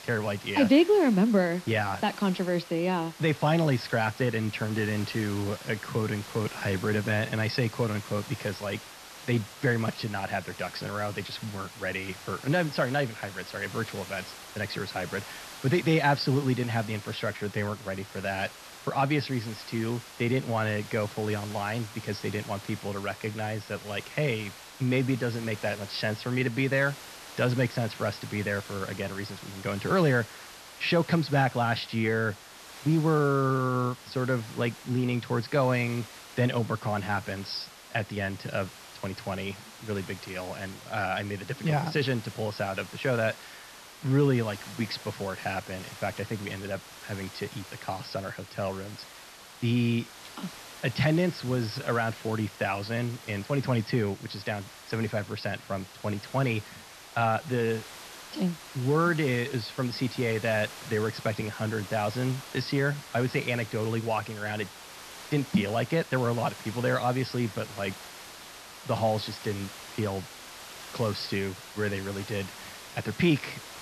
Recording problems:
high frequencies cut off; noticeable; nothing above 5.5 kHz
hiss; noticeable; throughout; 15 dB below the speech

